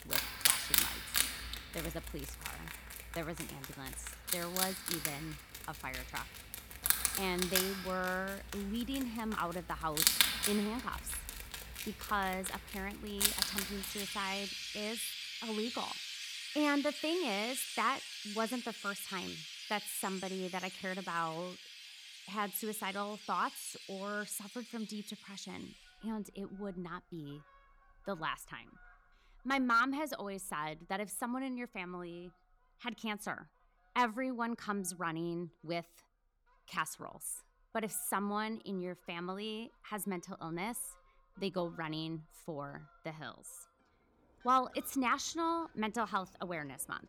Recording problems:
animal sounds; very loud; throughout; 1 dB above the speech

